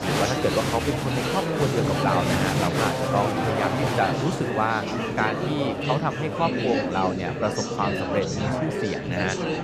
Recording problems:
murmuring crowd; very loud; throughout; 2 dB above the speech

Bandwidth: 14 kHz